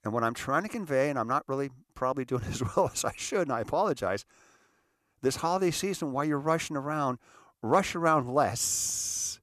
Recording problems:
none

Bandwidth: 14 kHz